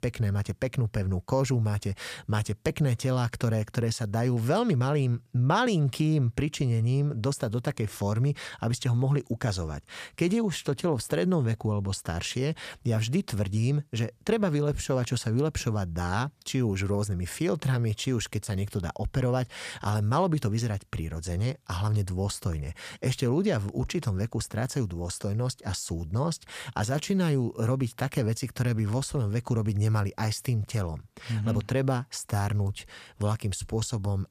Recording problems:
none

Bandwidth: 14.5 kHz